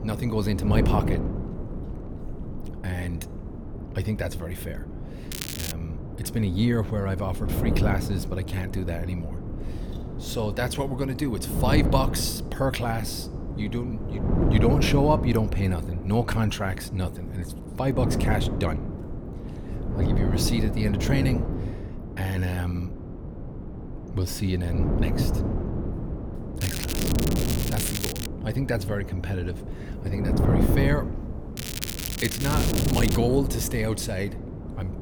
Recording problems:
wind noise on the microphone; heavy; 6 dB below the speech
crackling; loud; at 5.5 s, from 27 to 28 s and from 32 to 33 s; 4 dB below the speech

